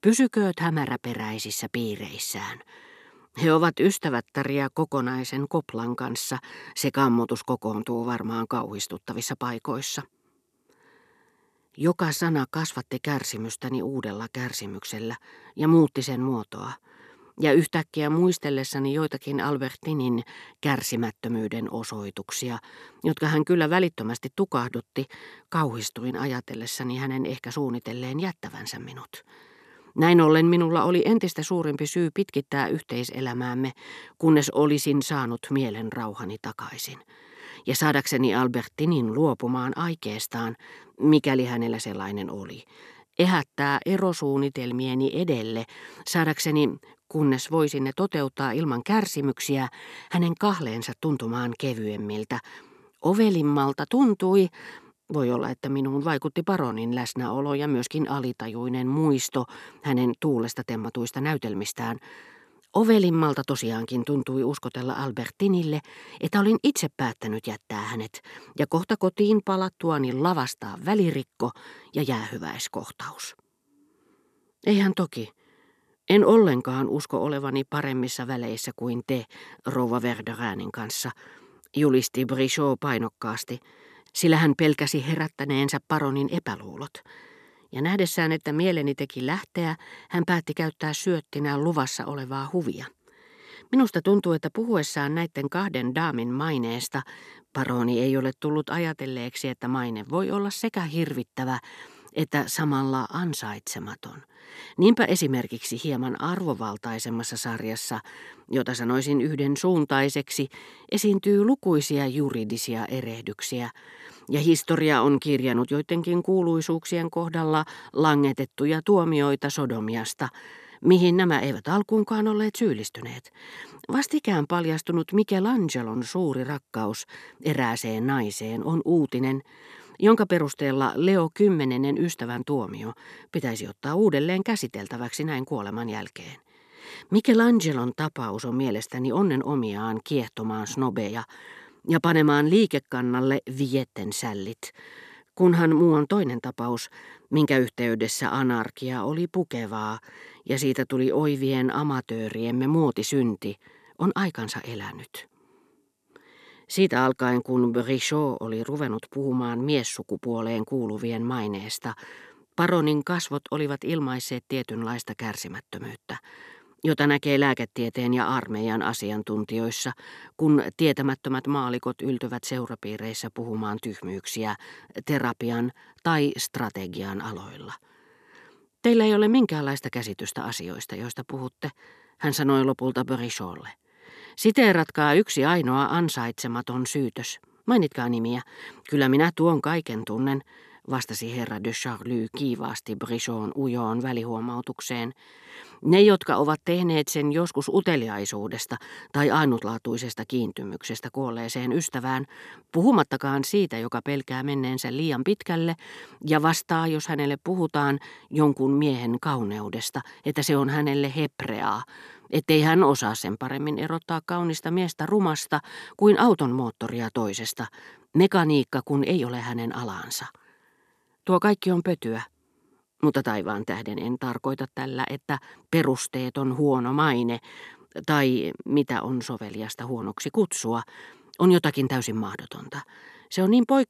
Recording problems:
none

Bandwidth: 14.5 kHz